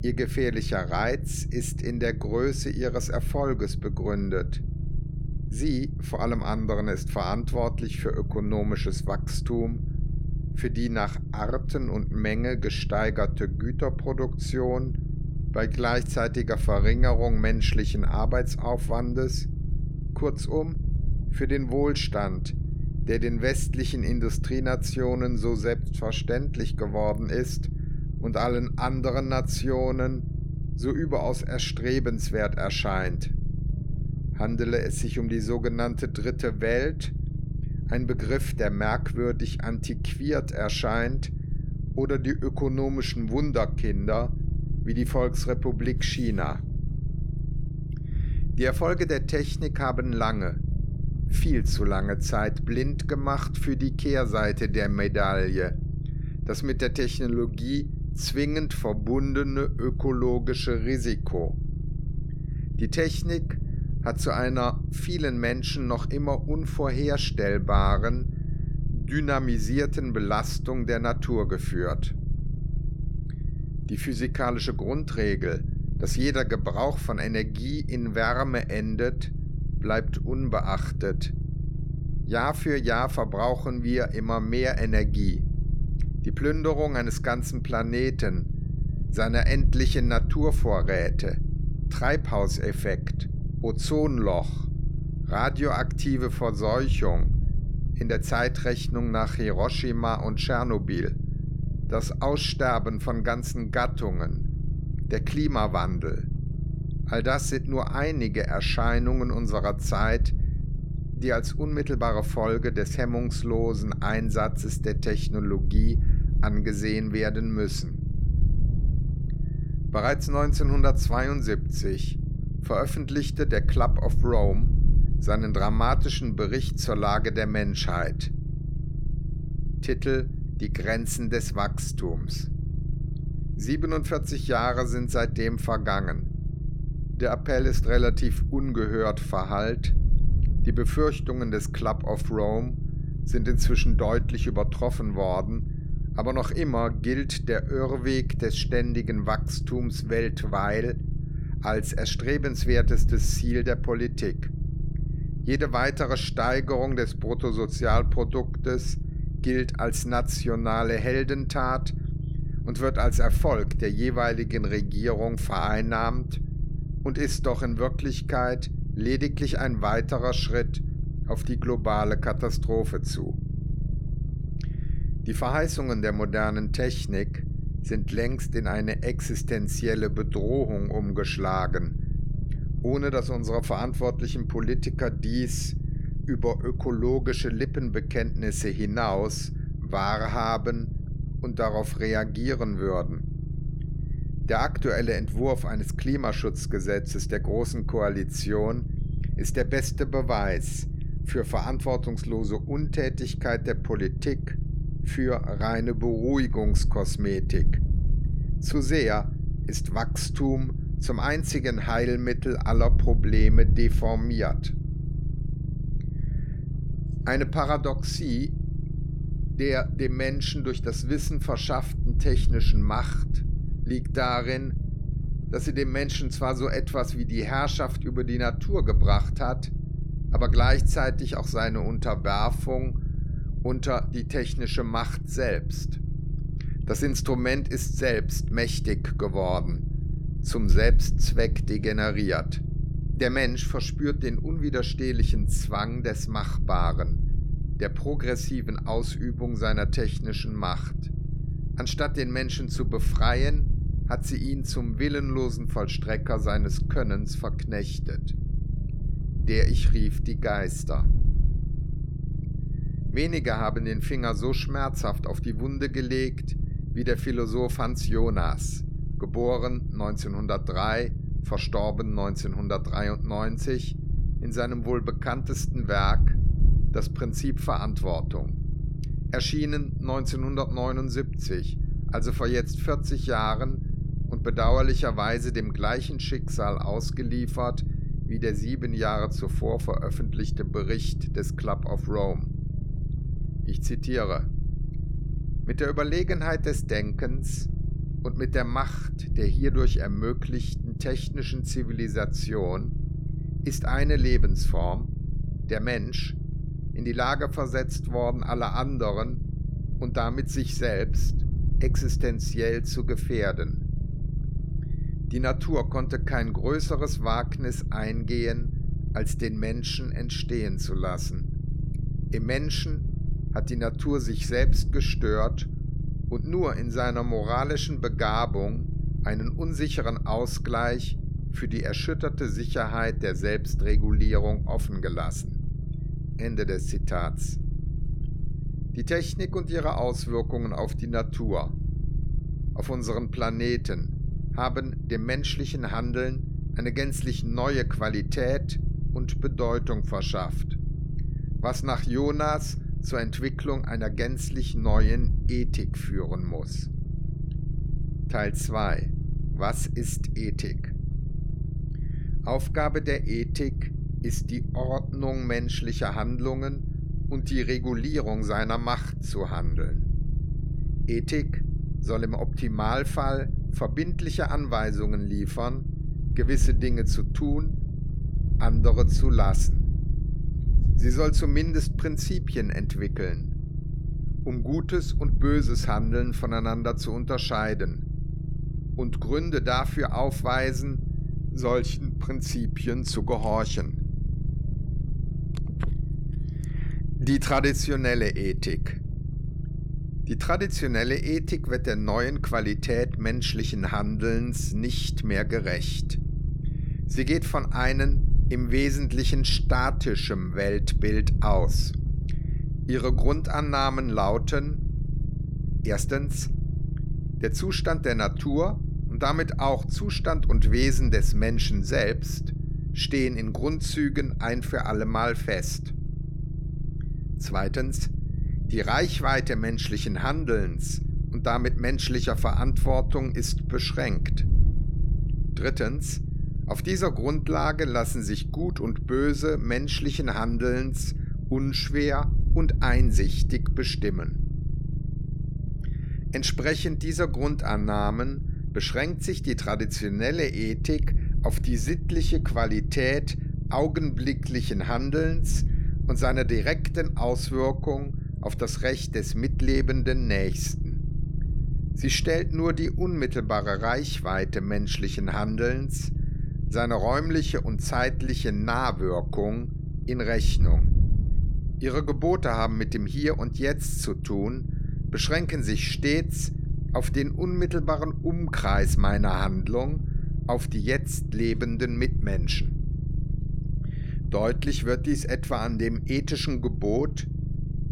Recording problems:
wind noise on the microphone; occasional gusts; 20 dB below the speech
low rumble; noticeable; throughout; 15 dB below the speech

